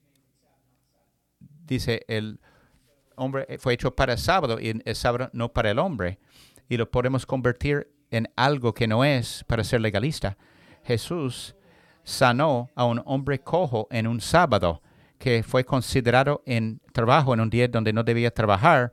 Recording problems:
none

